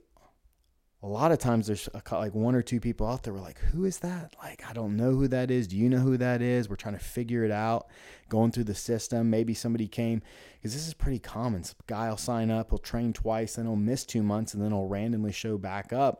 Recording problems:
none

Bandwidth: 16 kHz